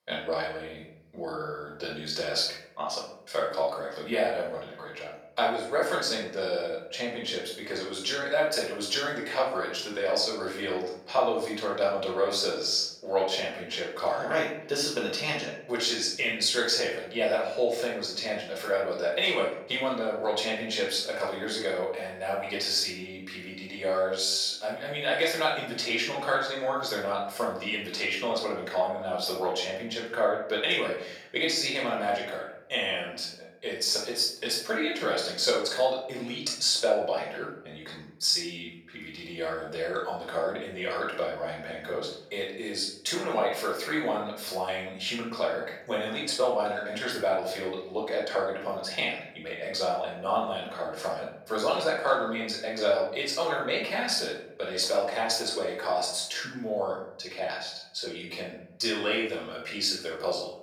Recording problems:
off-mic speech; far
room echo; noticeable; dies away in 0.6 s
thin; somewhat; fading below 450 Hz

